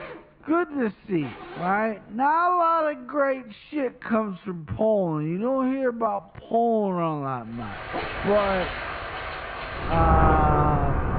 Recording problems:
high frequencies cut off; severe; nothing above 4.5 kHz
wrong speed, natural pitch; too slow; 0.5 times normal speed
muffled; very slightly; fading above 2.5 kHz
rain or running water; loud; from 8 s on; 2 dB below the speech
household noises; noticeable; throughout; 20 dB below the speech

